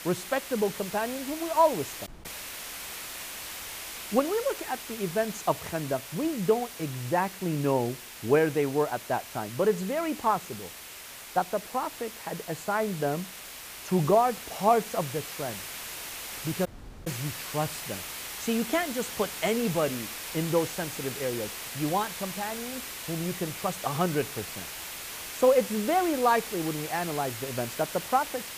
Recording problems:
hiss; loud; throughout; 8 dB below the speech
audio cutting out; at 2 s and at 17 s

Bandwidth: 15 kHz